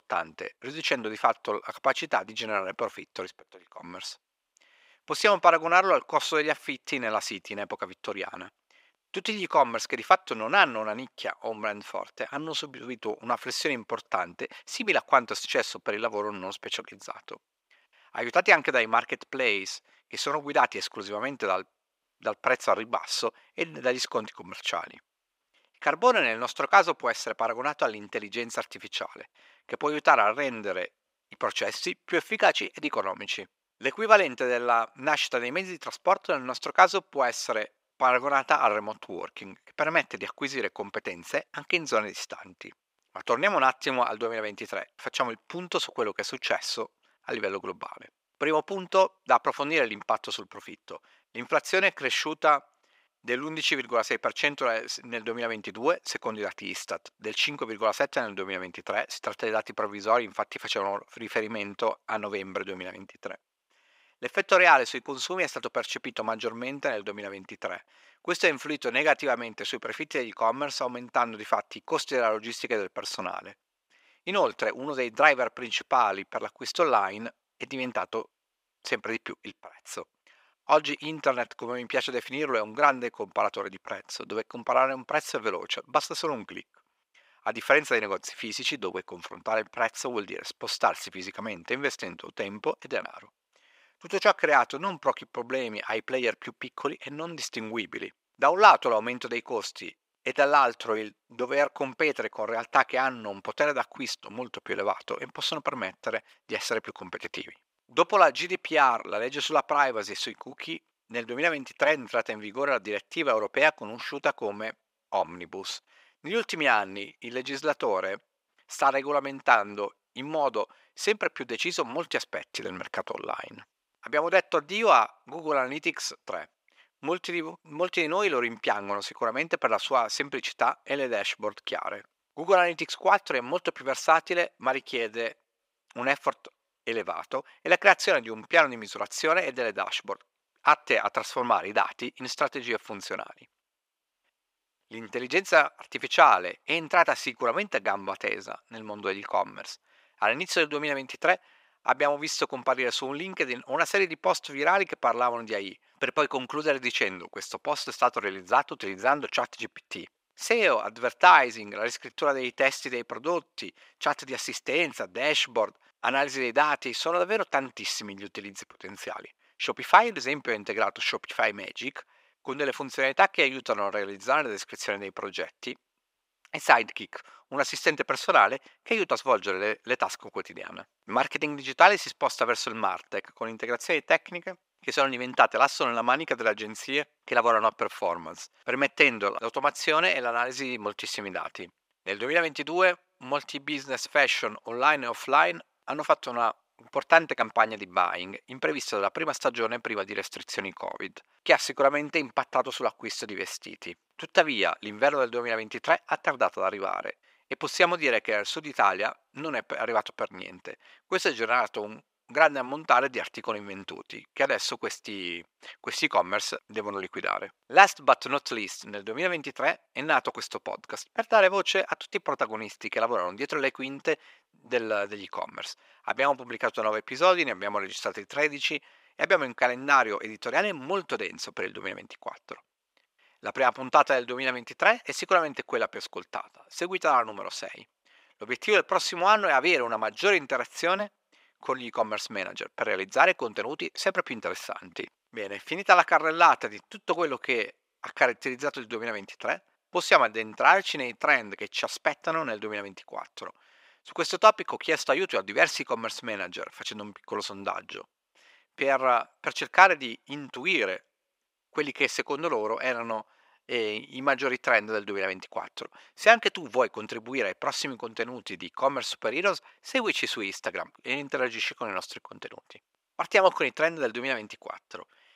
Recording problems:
thin; very; fading below 550 Hz

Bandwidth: 15.5 kHz